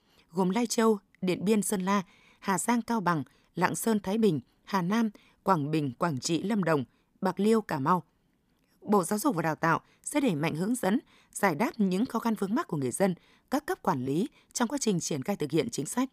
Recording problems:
none

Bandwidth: 15 kHz